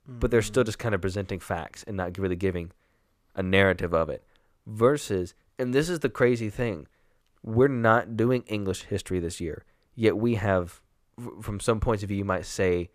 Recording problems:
none

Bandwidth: 14.5 kHz